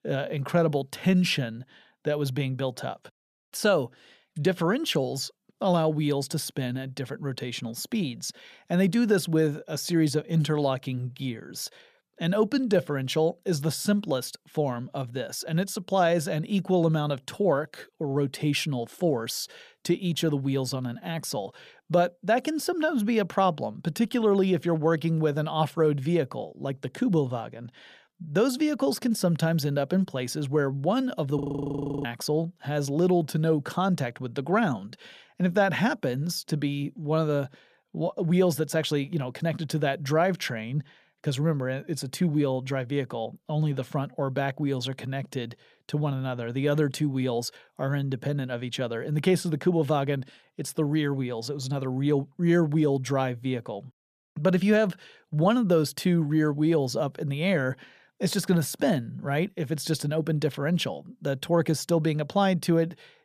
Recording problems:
audio freezing; at 31 s for 0.5 s

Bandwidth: 14.5 kHz